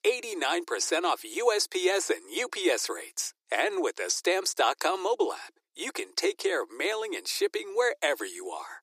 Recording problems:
thin; very; fading below 300 Hz

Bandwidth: 15 kHz